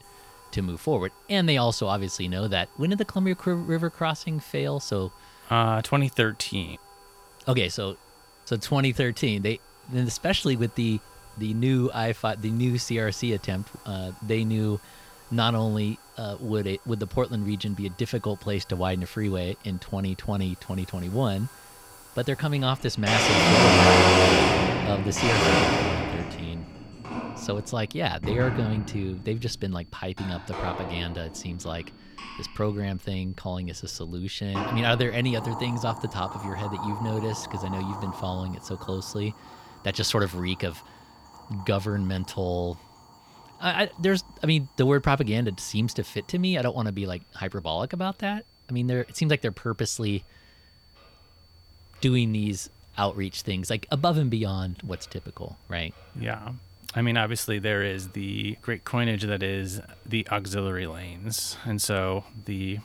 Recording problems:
household noises; very loud; throughout; 4 dB above the speech
high-pitched whine; faint; throughout; 4.5 kHz, 30 dB below the speech

